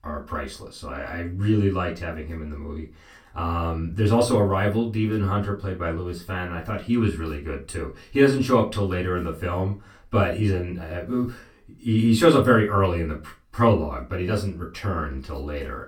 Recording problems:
off-mic speech; far
room echo; very slight; dies away in 0.2 s

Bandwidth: 18 kHz